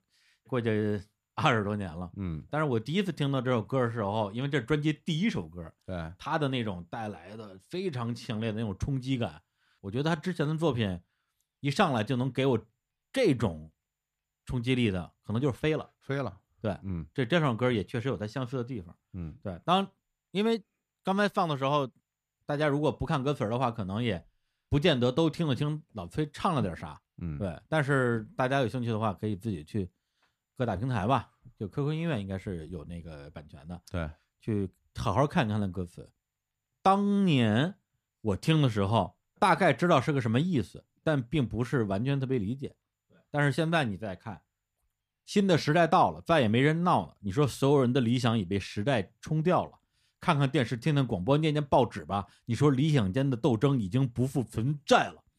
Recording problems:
none

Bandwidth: 14.5 kHz